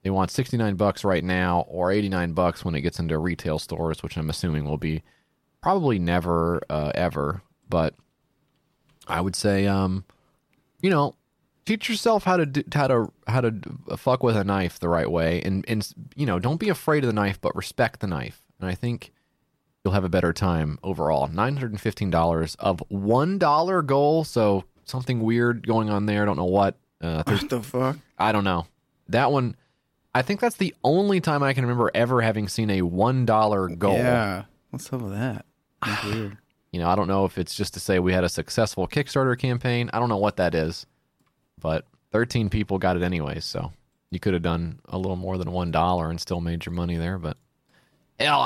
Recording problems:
abrupt cut into speech; at the end

